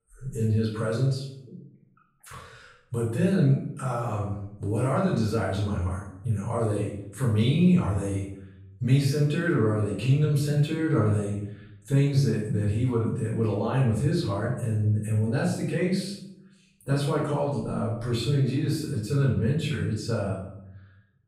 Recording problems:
off-mic speech; far
room echo; noticeable; dies away in 0.6 s

